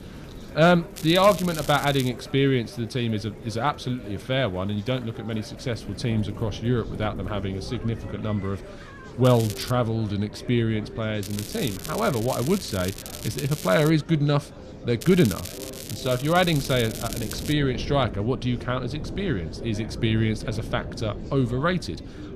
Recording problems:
murmuring crowd; noticeable; throughout; 20 dB below the speech
wind noise on the microphone; occasional gusts; 20 dB below the speech
crackling; noticeable; 4 times, first at 1 s; 10 dB below the speech

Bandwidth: 14.5 kHz